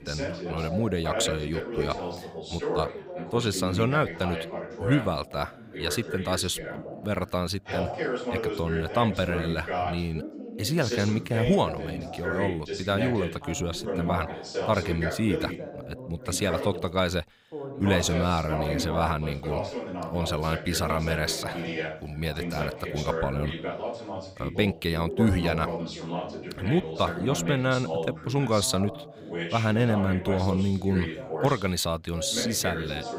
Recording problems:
background chatter; loud; throughout; 2 voices, 5 dB below the speech

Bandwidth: 15.5 kHz